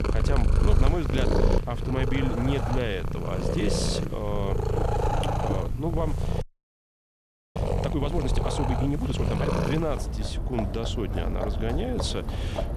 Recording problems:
animal sounds; very loud; throughout; 3 dB above the speech
low rumble; faint; throughout; 20 dB below the speech
audio freezing; at 6.5 s for 1 s

